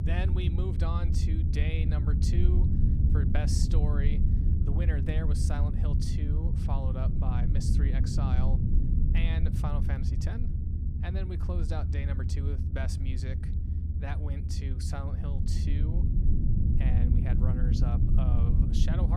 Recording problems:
low rumble; loud; throughout; 1 dB below the speech
abrupt cut into speech; at the end

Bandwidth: 14.5 kHz